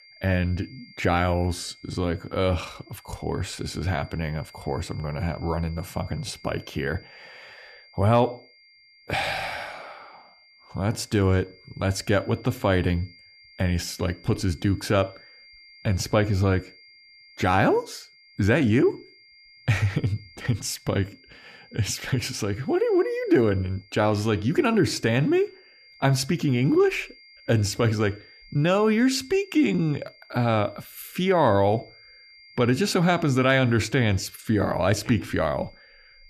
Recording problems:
high-pitched whine; faint; throughout; 2 kHz, 25 dB below the speech

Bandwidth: 14.5 kHz